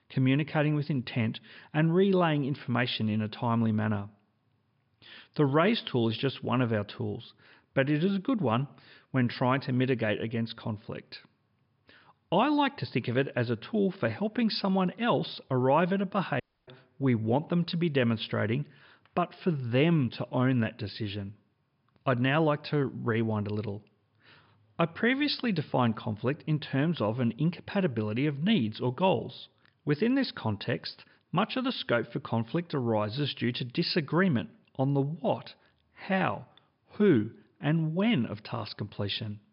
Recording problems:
high frequencies cut off; noticeable; nothing above 5 kHz
audio cutting out; at 16 s

